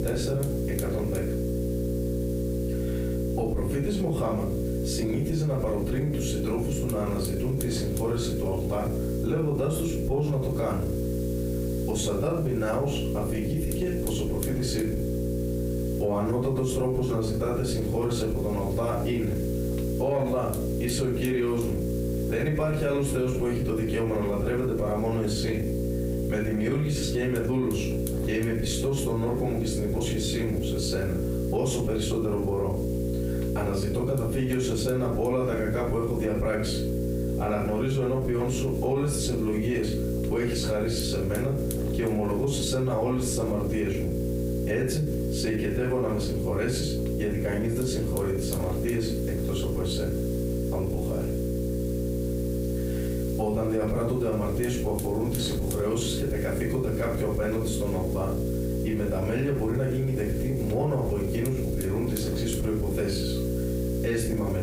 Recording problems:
off-mic speech; far
room echo; noticeable; dies away in 0.3 s
squashed, flat; somewhat
electrical hum; loud; throughout; 60 Hz, 5 dB below the speech
hiss; noticeable; throughout; 15 dB below the speech

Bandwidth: 15.5 kHz